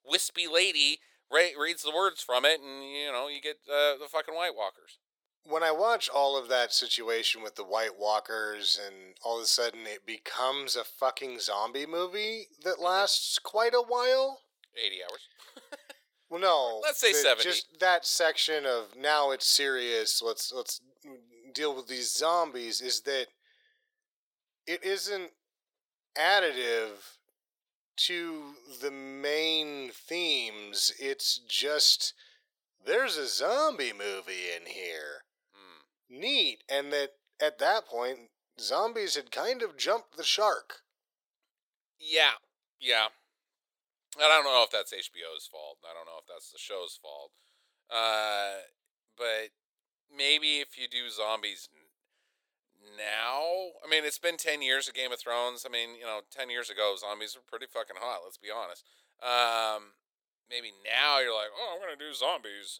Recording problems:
thin; very; fading below 500 Hz

